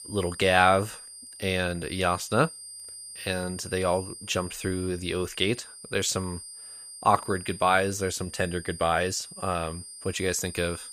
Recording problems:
high-pitched whine; noticeable; throughout; 9 kHz, 15 dB below the speech

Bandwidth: 15 kHz